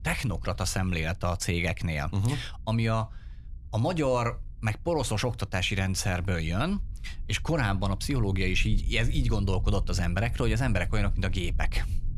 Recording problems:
low rumble; faint; throughout; 25 dB below the speech

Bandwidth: 14.5 kHz